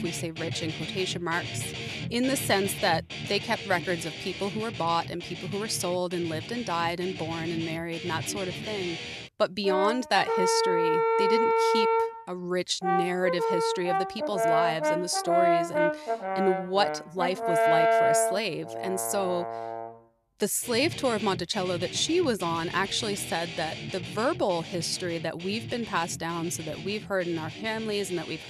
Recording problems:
background music; loud; throughout; 1 dB below the speech

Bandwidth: 14 kHz